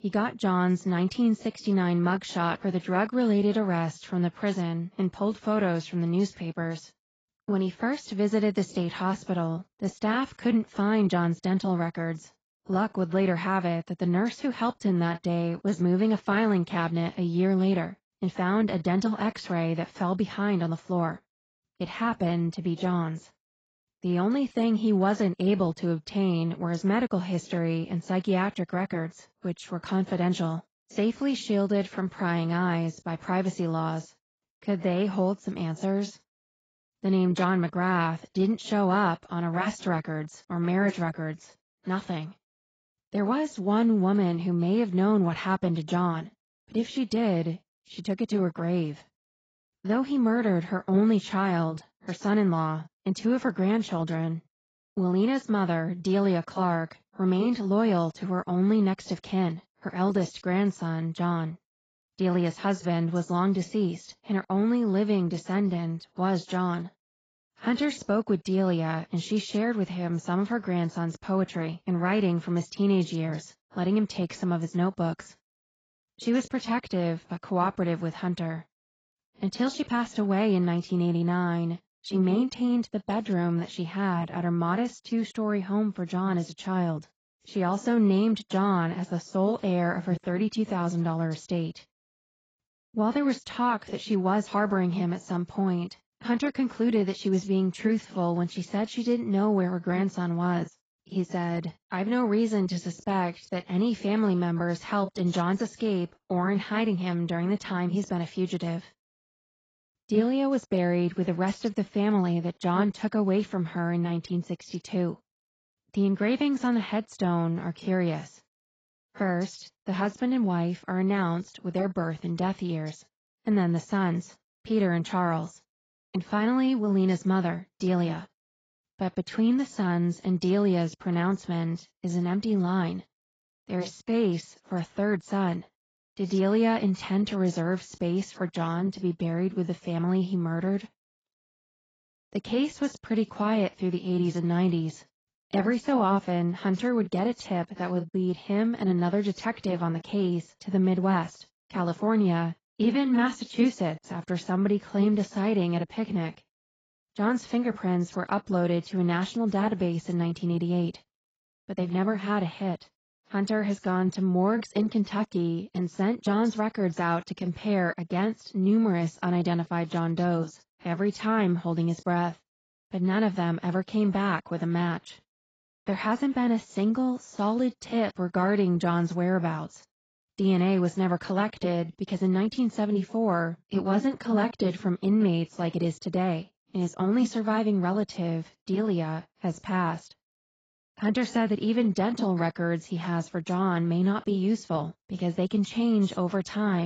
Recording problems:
garbled, watery; badly; nothing above 7.5 kHz
abrupt cut into speech; at the end

